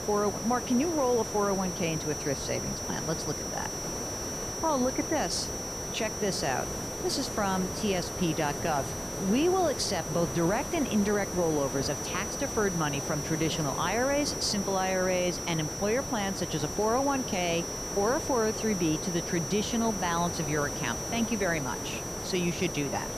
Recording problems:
high-pitched whine; loud; throughout; 6 kHz, 6 dB below the speech
hiss; loud; throughout; 7 dB below the speech

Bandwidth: 14.5 kHz